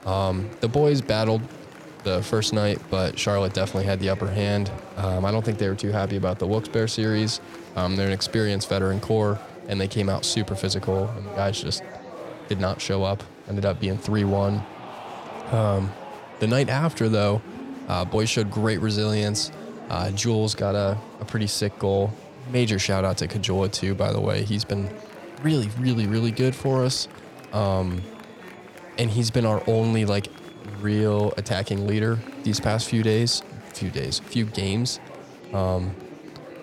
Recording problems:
murmuring crowd; noticeable; throughout; 15 dB below the speech

